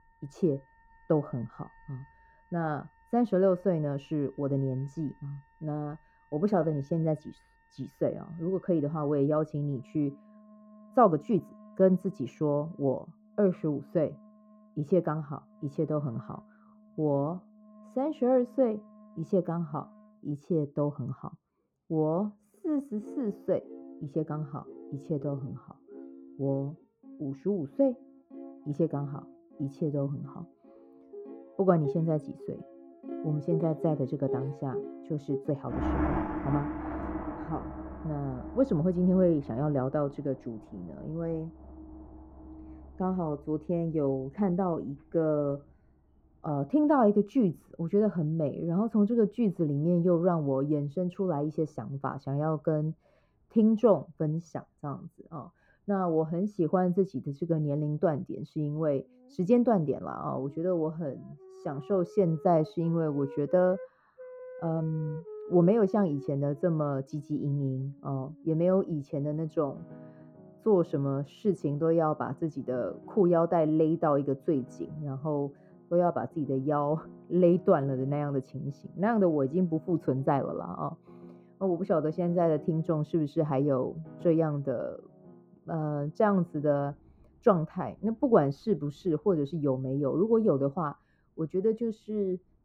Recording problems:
muffled; very; fading above 1.5 kHz
background music; noticeable; throughout; 15 dB below the speech
uneven, jittery; strongly; from 6 s to 1:09

